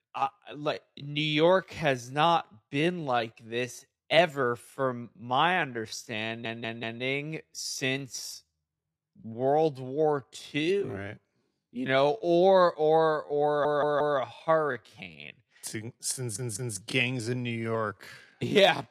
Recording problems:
wrong speed, natural pitch; too slow; 0.6 times normal speed
audio stuttering; at 6.5 s, at 13 s and at 16 s

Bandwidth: 14 kHz